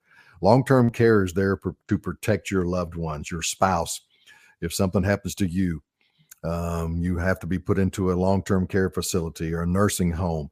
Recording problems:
none

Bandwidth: 15 kHz